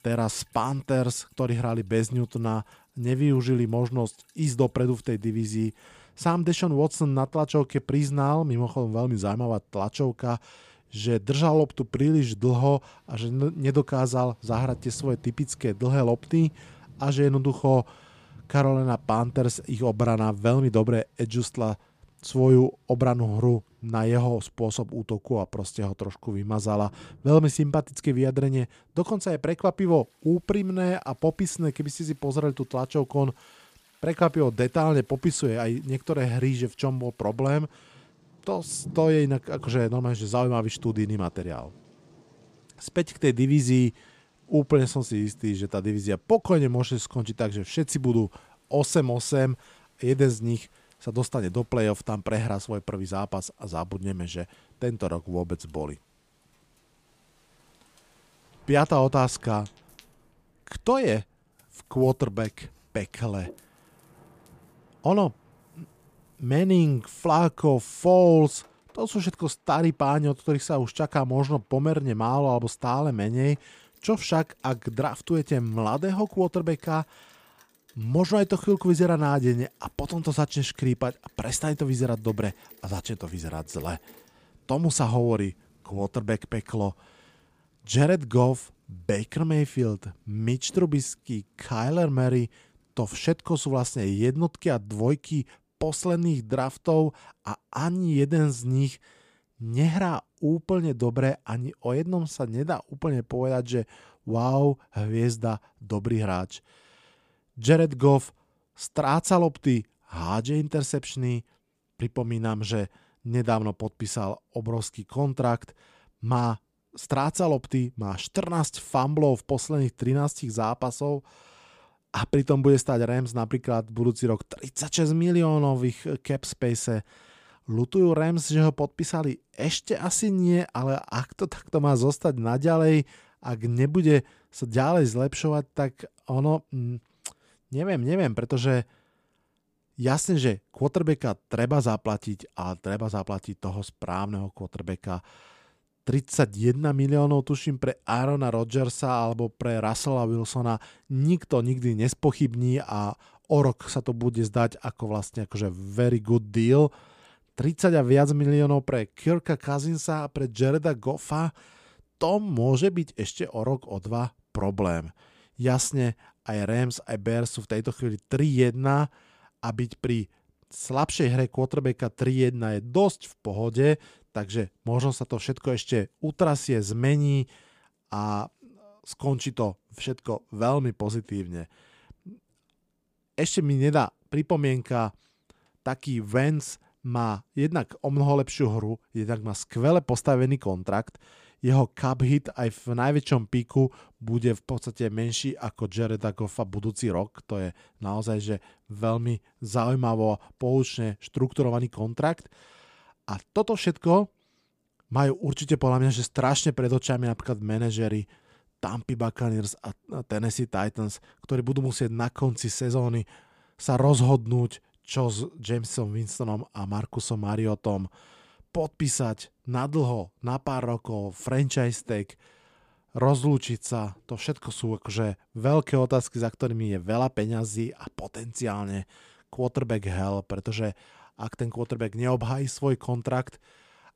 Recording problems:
rain or running water; faint; until 1:34; 30 dB below the speech

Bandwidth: 15 kHz